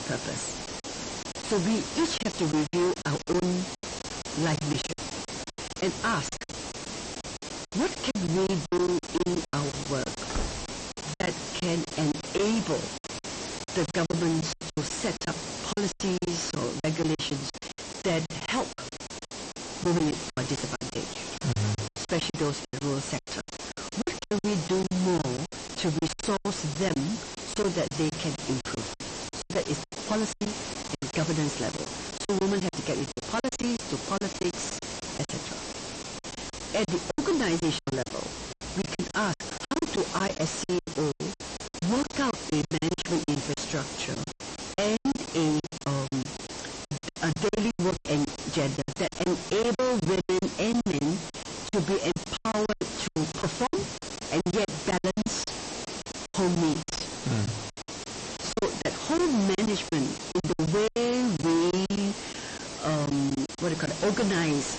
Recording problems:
distortion; heavy; 5 dB below the speech
garbled, watery; slightly; nothing above 8 kHz
hiss; loud; throughout; 7 dB below the speech
choppy; very; 17% of the speech affected
door banging; noticeable; at 10 s; peak 7 dB below the speech

